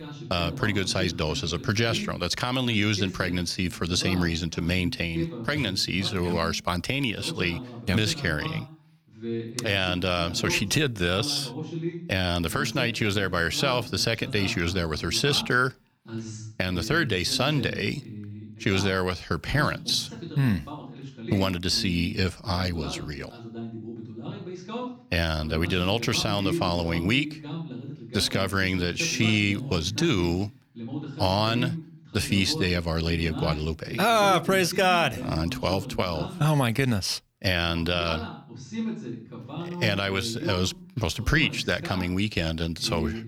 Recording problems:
voice in the background; noticeable; throughout; 10 dB below the speech

